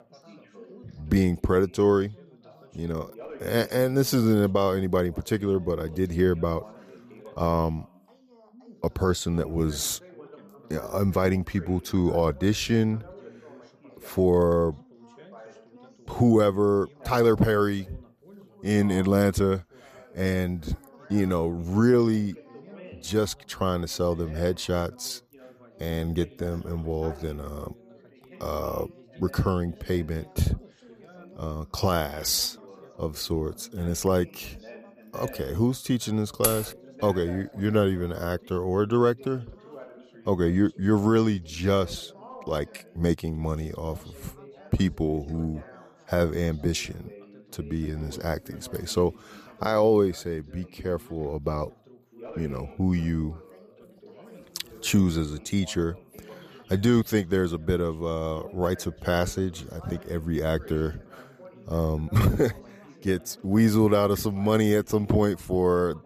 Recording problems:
background chatter; faint; throughout; 3 voices, 20 dB below the speech
jangling keys; noticeable; at 36 s; peak 1 dB below the speech

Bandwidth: 14.5 kHz